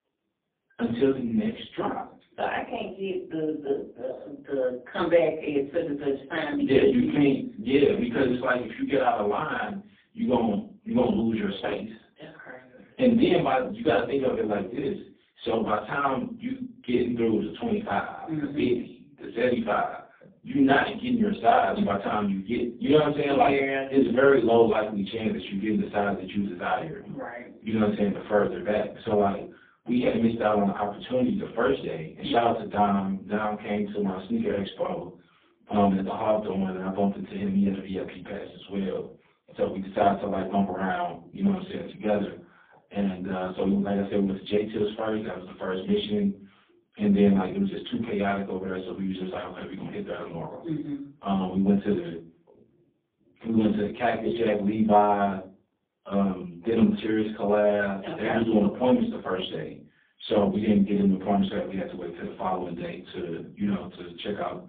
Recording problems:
phone-call audio; poor line; nothing above 3.5 kHz
off-mic speech; far
room echo; slight; dies away in 0.3 s

